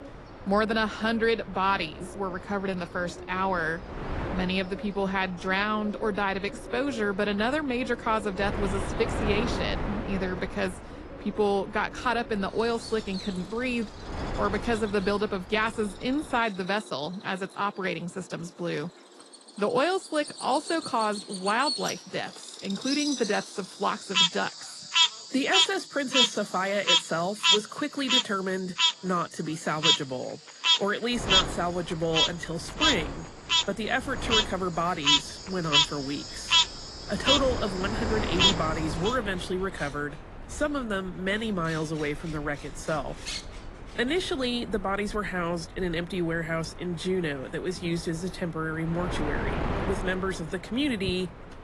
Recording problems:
garbled, watery; slightly; nothing above 11 kHz
animal sounds; very loud; throughout; 4 dB above the speech
wind noise on the microphone; occasional gusts; until 16 s and from 31 s on; 10 dB below the speech

